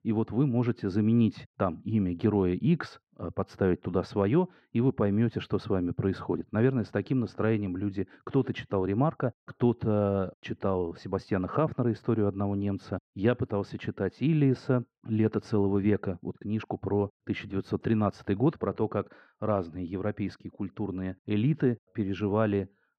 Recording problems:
muffled; very; fading above 4 kHz

